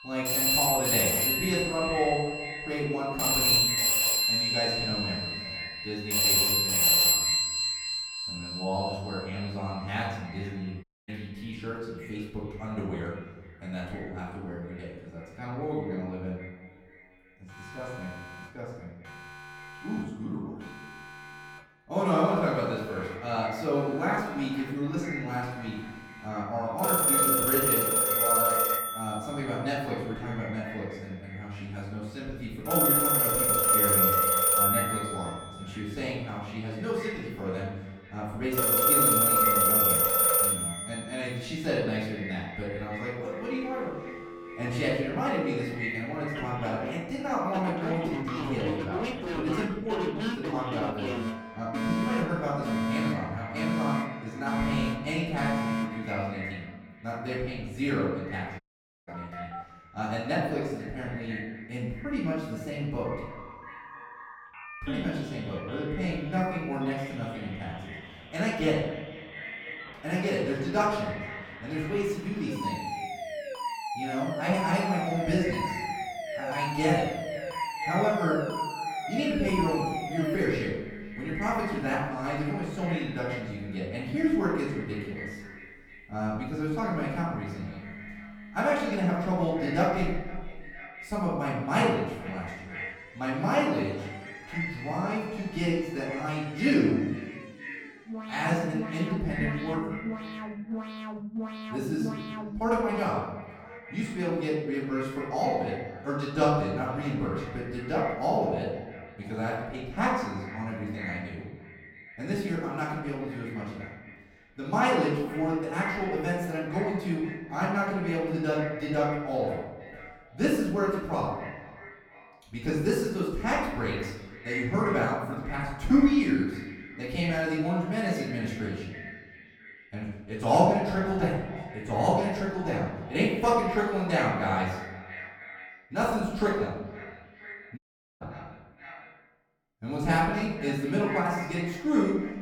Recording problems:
off-mic speech; far
echo of what is said; noticeable; throughout; 490 ms later, 15 dB below the speech
room echo; noticeable; dies away in 0.9 s
alarms or sirens; very loud; until 1:43; 4 dB above the speech
audio cutting out; at 11 s, at 59 s and at 2:18

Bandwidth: 18 kHz